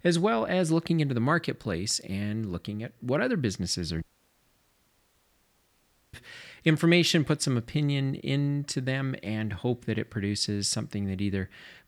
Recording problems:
audio cutting out; at 4 s for 2 s

